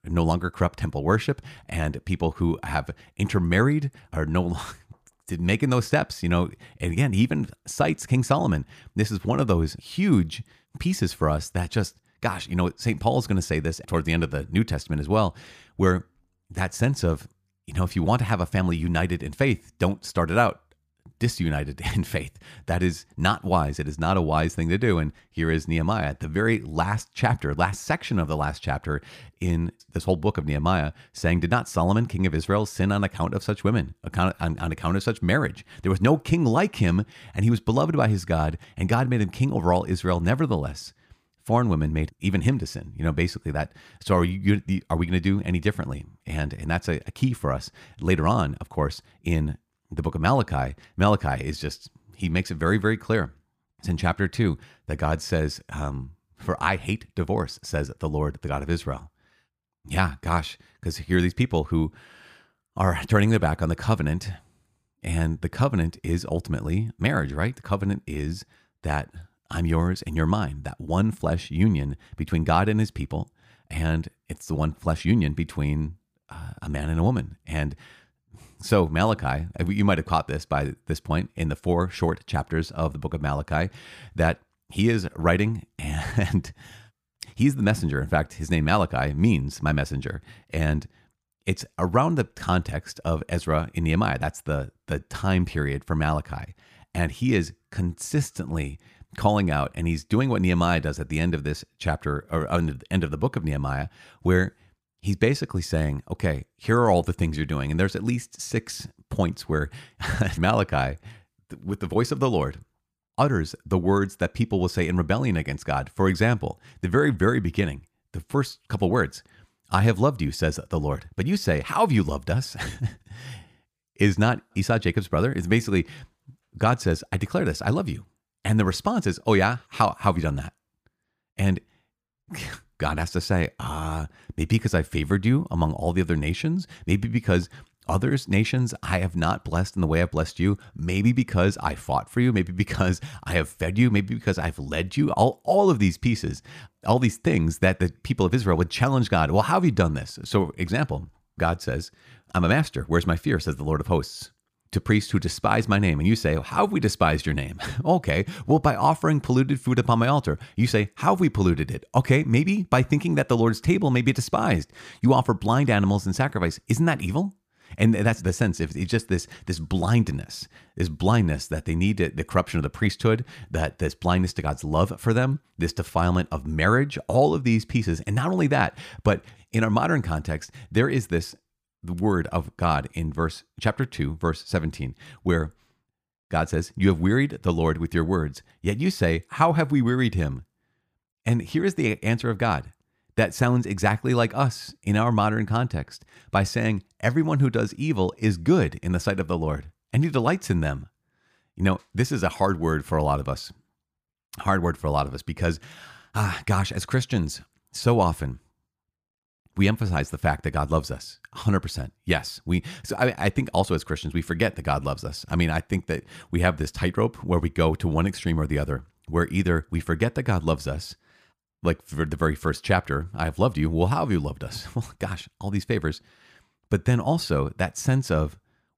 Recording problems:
none

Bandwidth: 15 kHz